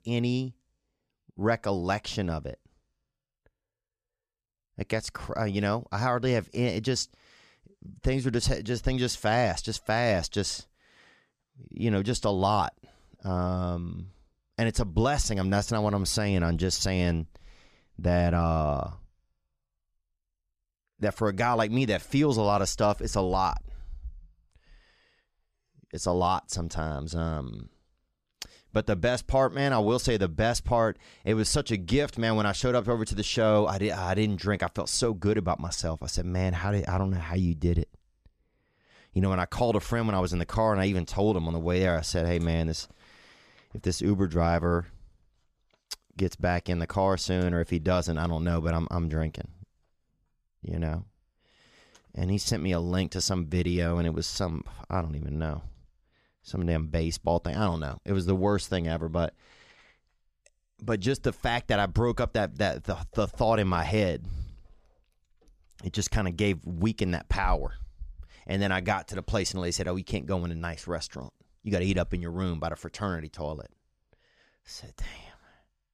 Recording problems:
none

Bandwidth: 14.5 kHz